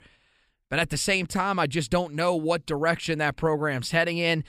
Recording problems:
none

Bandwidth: 15 kHz